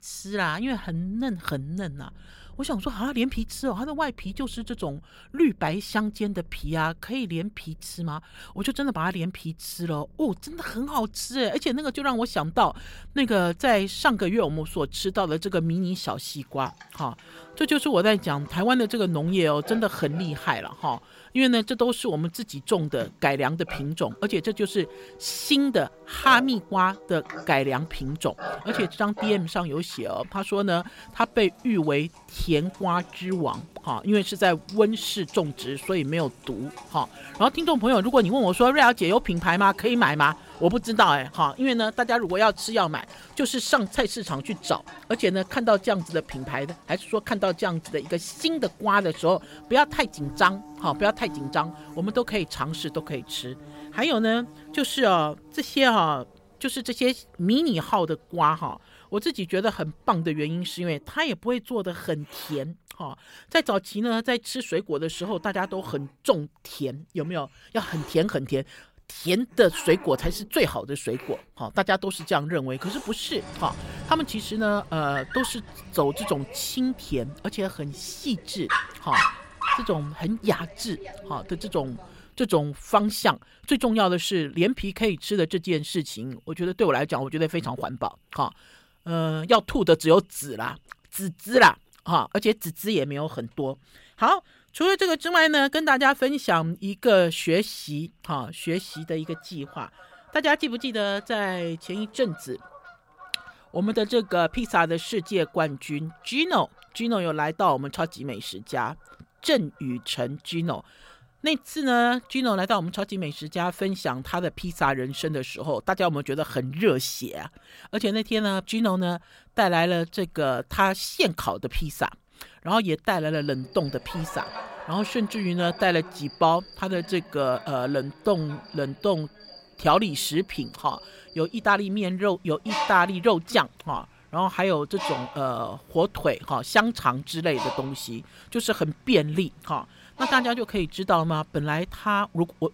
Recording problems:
animal sounds; noticeable; throughout; 15 dB below the speech

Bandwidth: 16 kHz